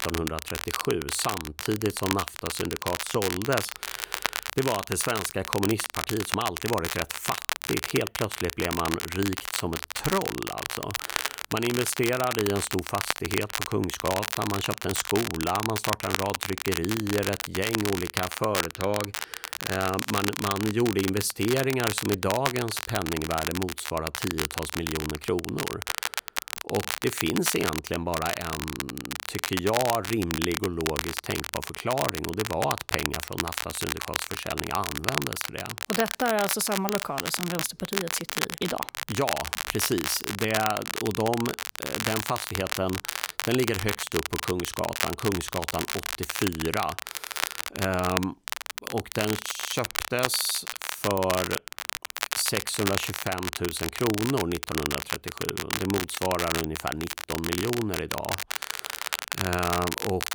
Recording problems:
crackle, like an old record; loud; 2 dB below the speech

